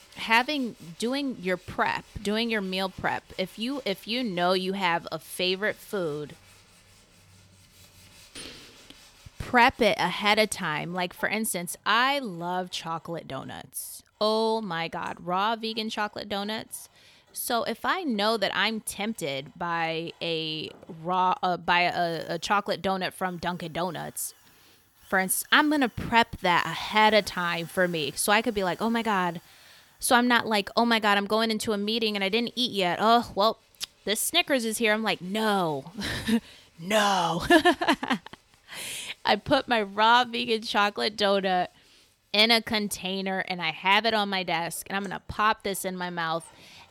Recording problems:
machinery noise; faint; throughout; 30 dB below the speech

